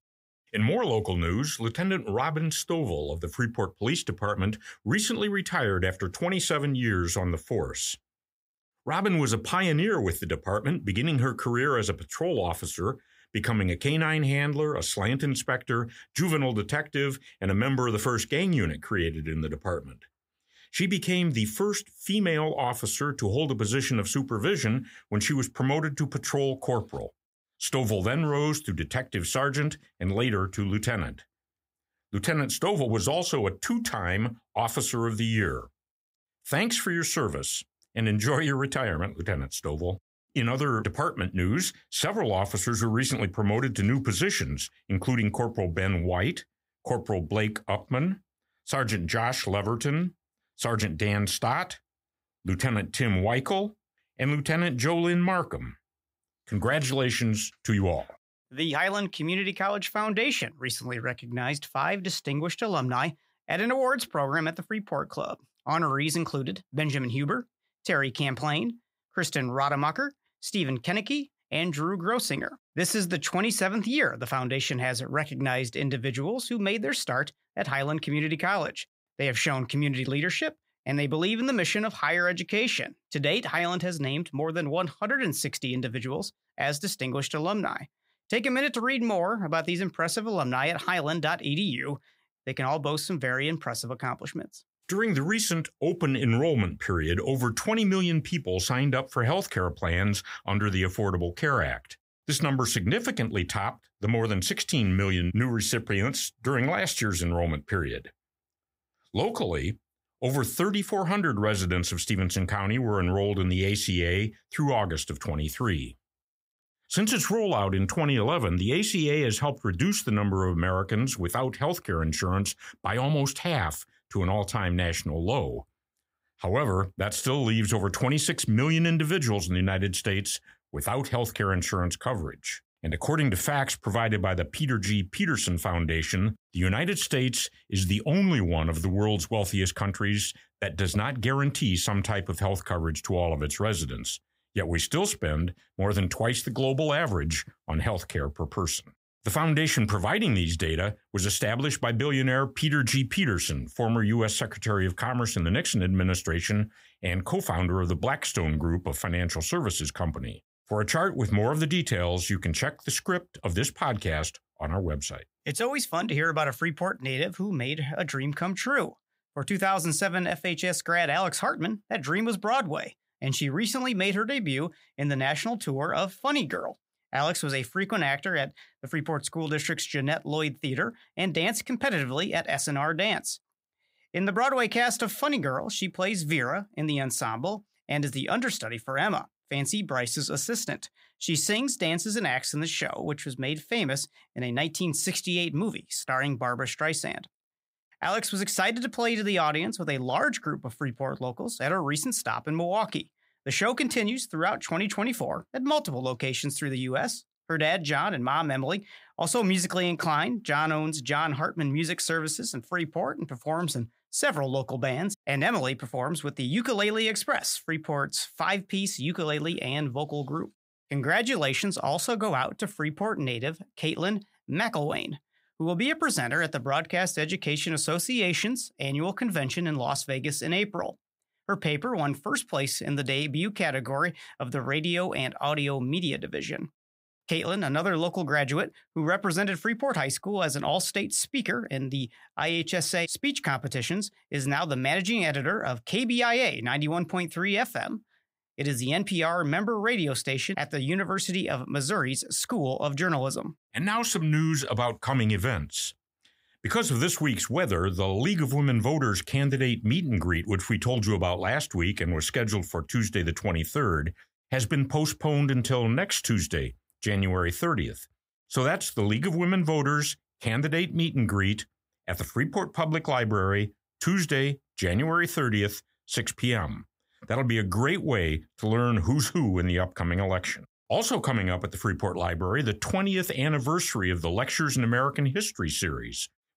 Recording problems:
none

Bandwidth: 15.5 kHz